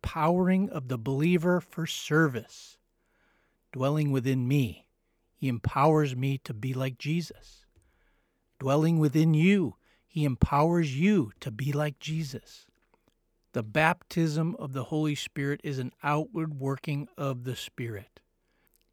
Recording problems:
none

